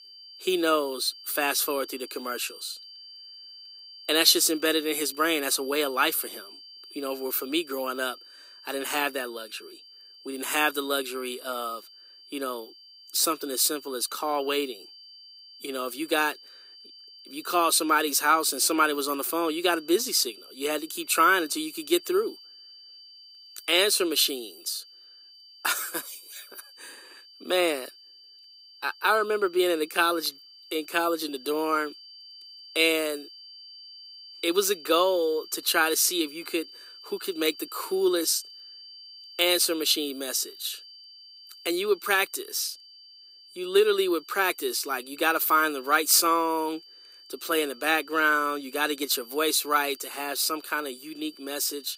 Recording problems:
thin; somewhat; fading below 300 Hz
high-pitched whine; faint; throughout; 4.5 kHz, 20 dB below the speech

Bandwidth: 15.5 kHz